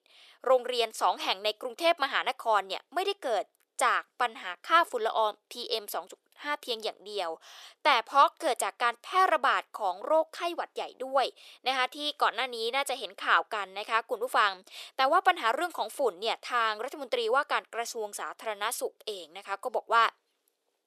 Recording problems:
thin; very; fading below 450 Hz

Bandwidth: 14 kHz